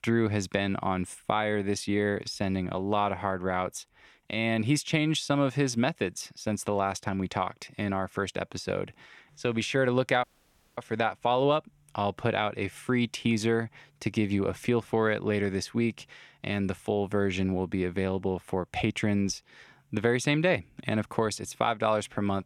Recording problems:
audio cutting out; at 10 s for 0.5 s

